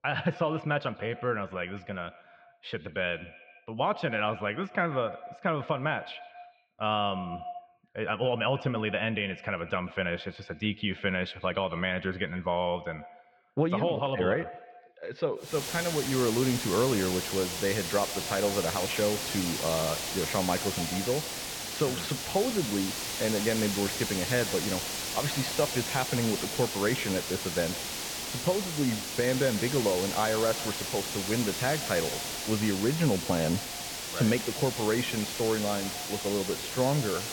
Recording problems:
echo of what is said; noticeable; throughout; 140 ms later, 15 dB below the speech
muffled; slightly; fading above 3.5 kHz
hiss; loud; from 16 s on; 3 dB below the speech

